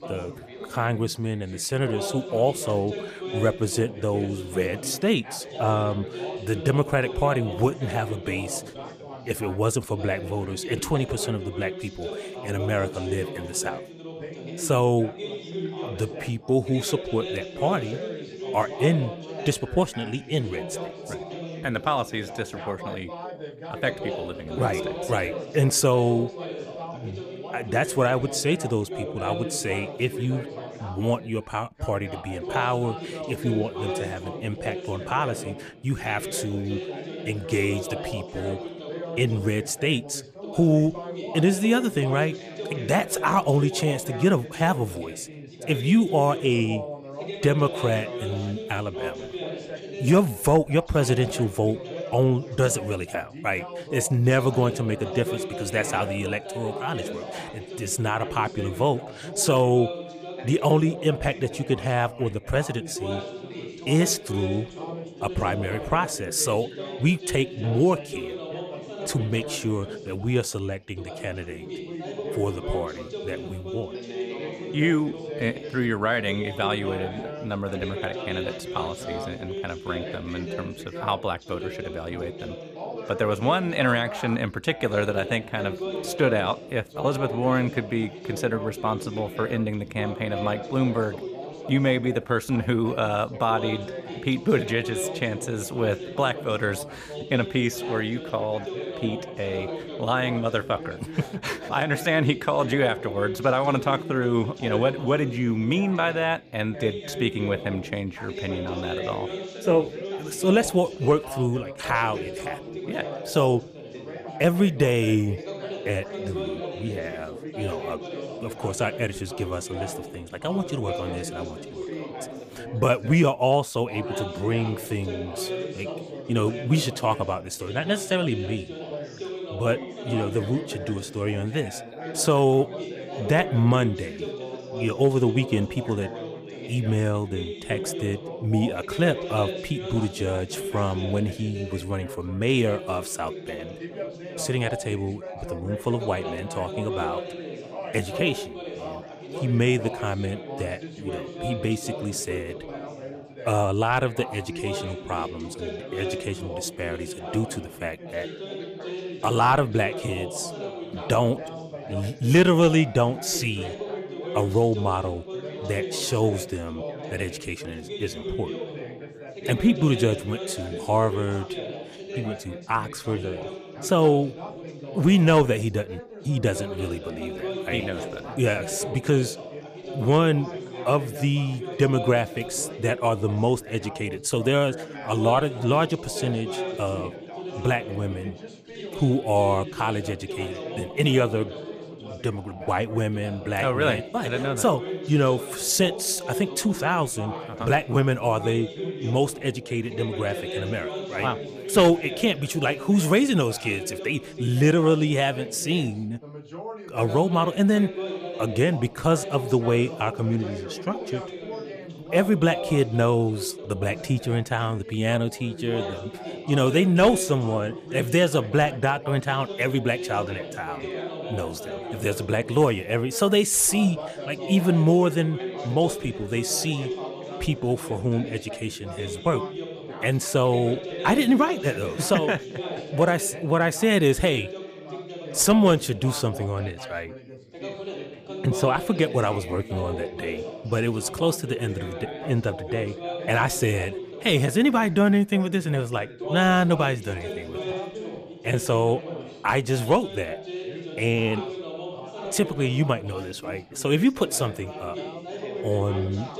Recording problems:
background chatter; loud; throughout; 3 voices, 10 dB below the speech

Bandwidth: 15 kHz